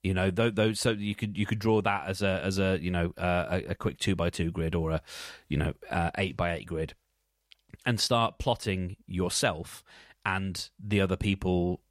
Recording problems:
none

